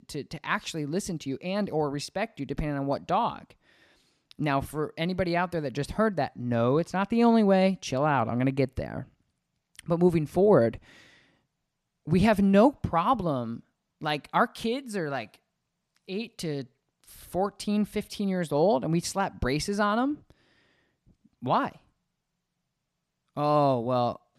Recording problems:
none

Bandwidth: 13.5 kHz